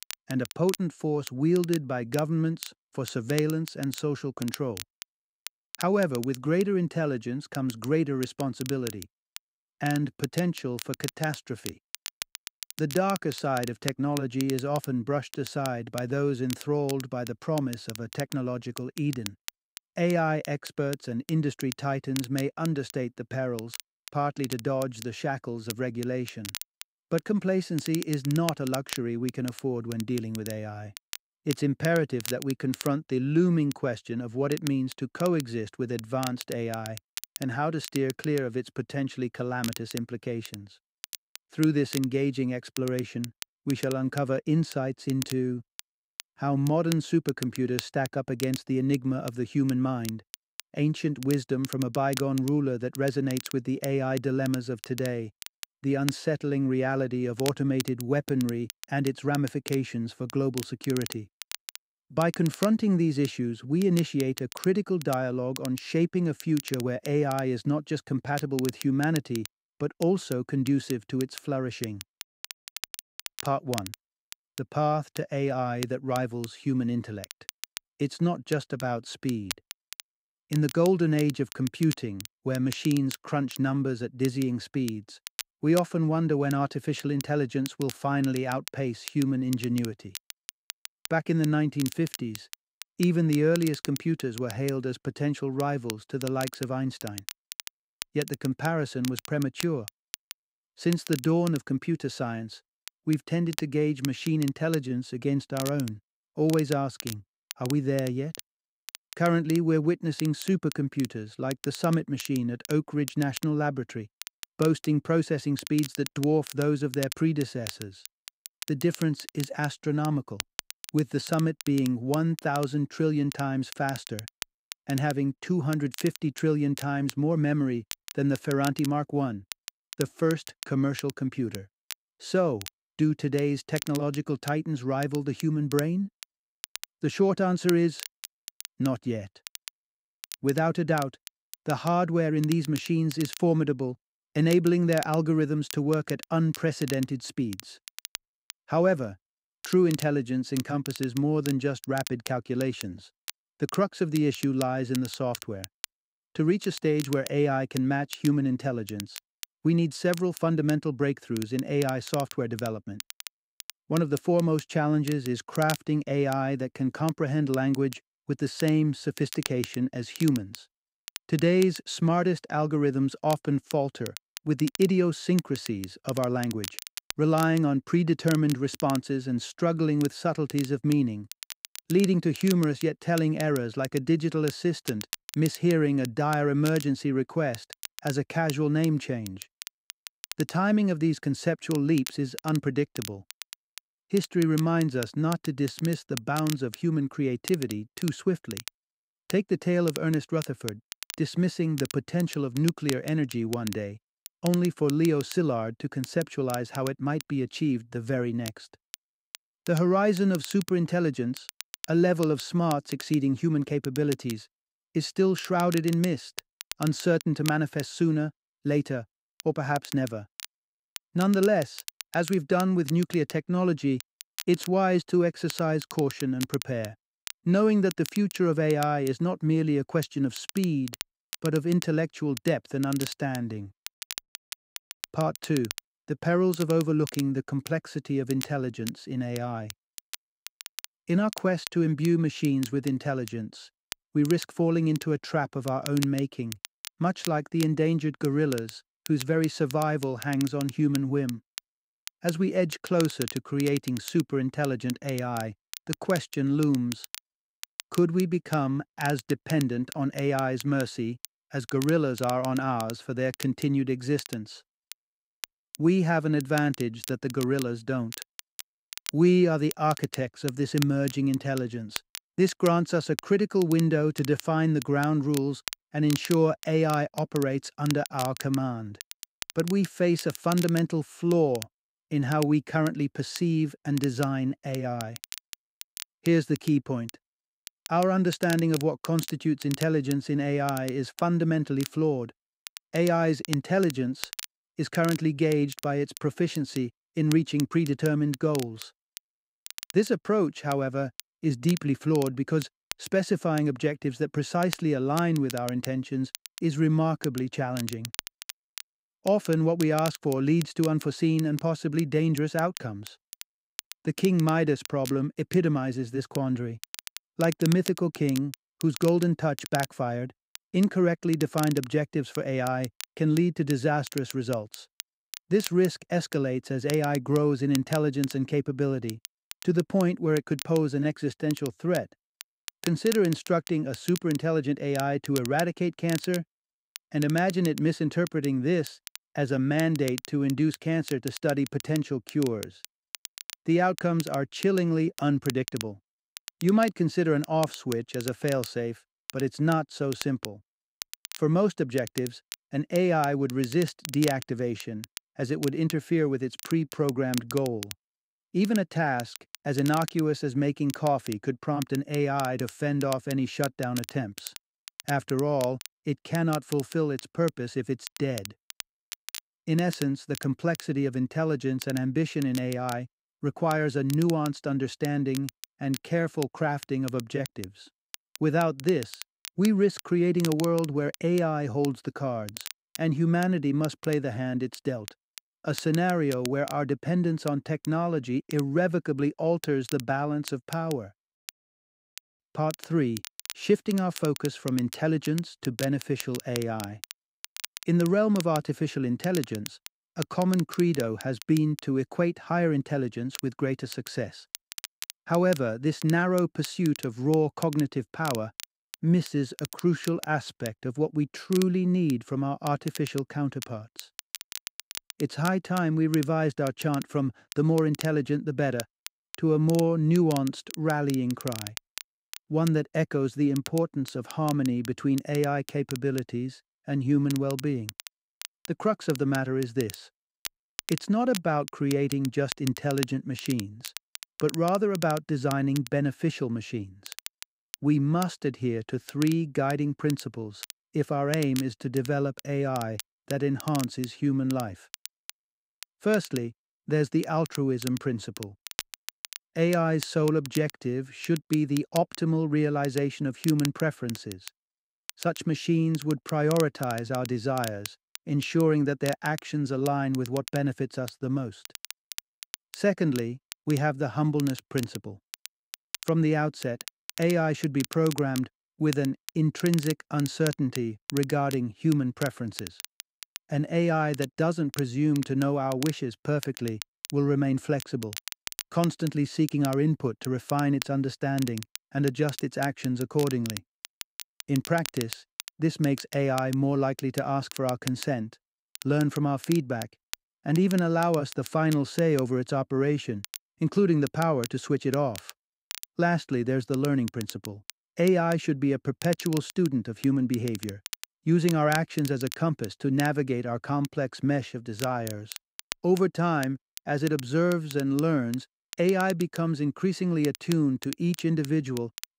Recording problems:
crackle, like an old record; noticeable; 15 dB below the speech

